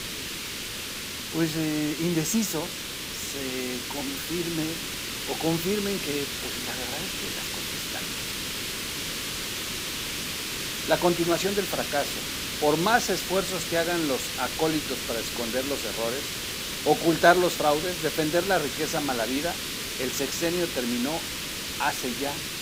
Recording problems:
hiss; loud; throughout; 3 dB below the speech

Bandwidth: 15.5 kHz